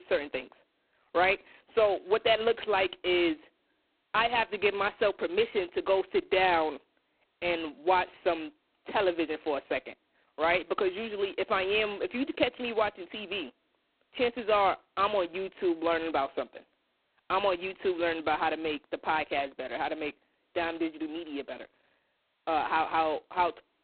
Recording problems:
phone-call audio; poor line; nothing above 4 kHz
abrupt cut into speech; at the start

